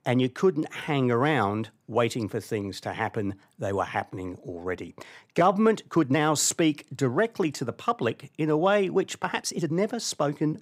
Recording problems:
uneven, jittery; strongly; from 0.5 to 9.5 s

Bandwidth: 15.5 kHz